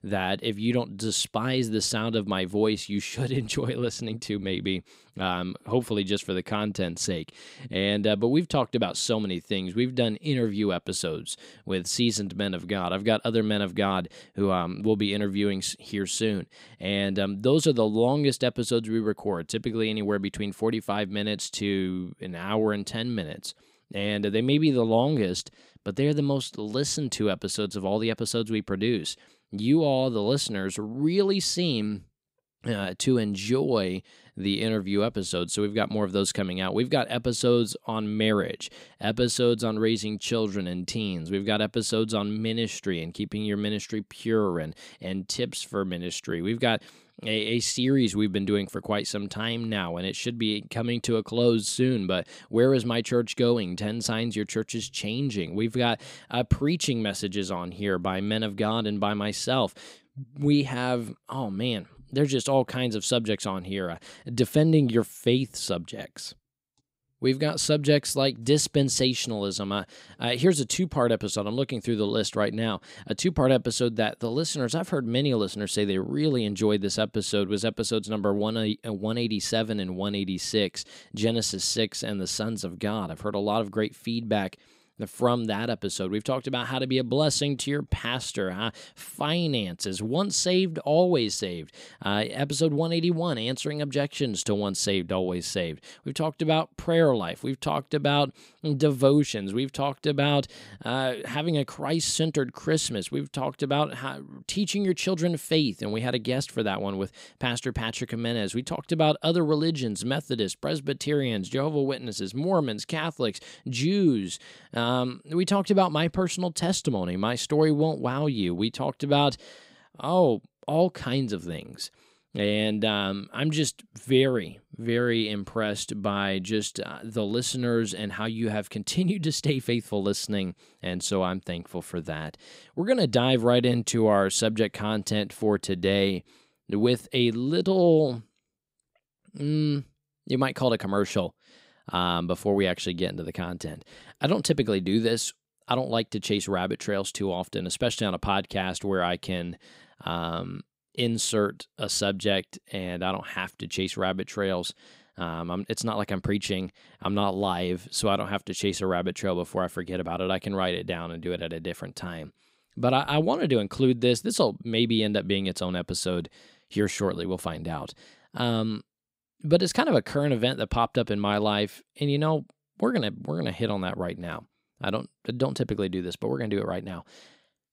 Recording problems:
none

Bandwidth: 15.5 kHz